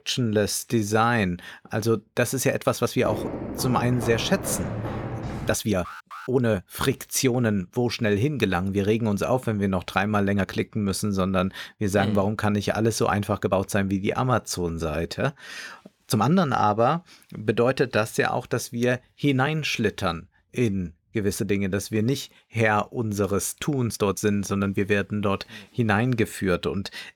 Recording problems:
uneven, jittery; strongly; from 0.5 to 25 s
footsteps; noticeable; from 3 to 5.5 s; peak 6 dB below the speech
alarm; faint; at 6 s; peak 15 dB below the speech

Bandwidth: 18.5 kHz